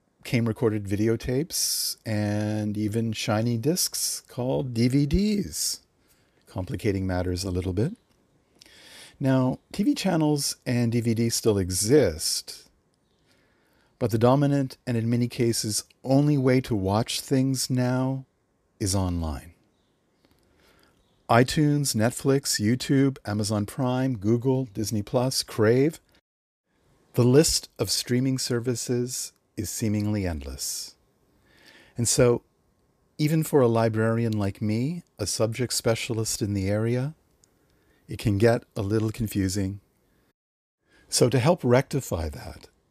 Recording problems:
none

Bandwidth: 14.5 kHz